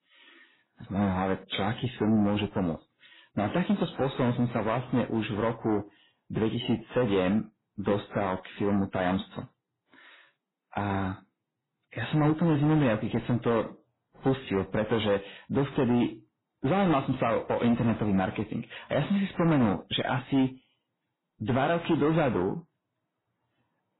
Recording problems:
garbled, watery; badly; nothing above 4 kHz
distortion; slight; 10 dB below the speech

